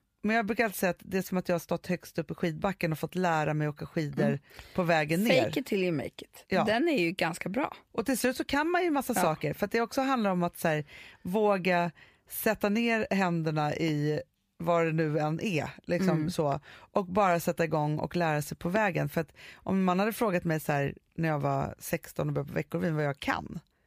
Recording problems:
none

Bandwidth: 15 kHz